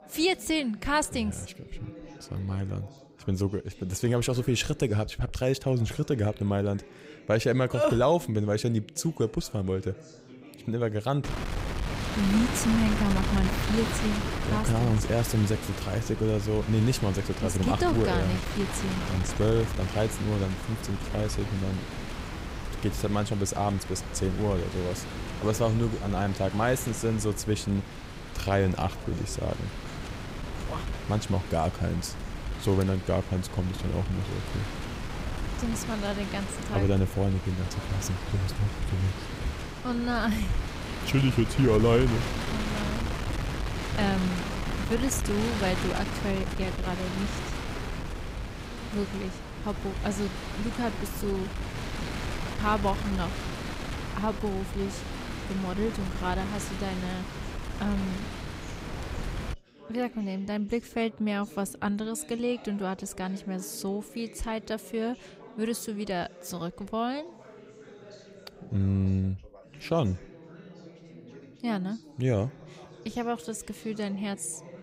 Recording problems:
wind noise on the microphone; heavy; from 11 s to 1:00; 5 dB below the speech
background chatter; noticeable; throughout; 3 voices, 20 dB below the speech

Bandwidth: 15.5 kHz